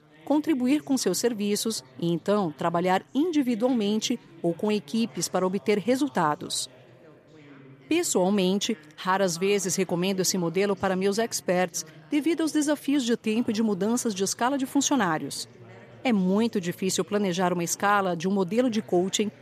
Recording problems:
background chatter; faint; throughout; 3 voices, 25 dB below the speech

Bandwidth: 14.5 kHz